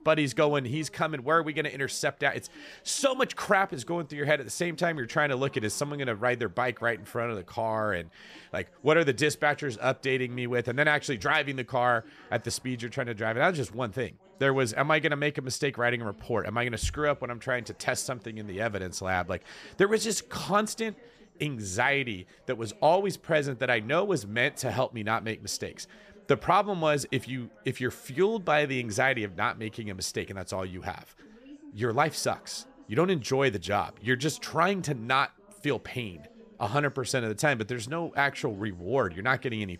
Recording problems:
background chatter; faint; throughout; 3 voices, 25 dB below the speech

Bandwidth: 14.5 kHz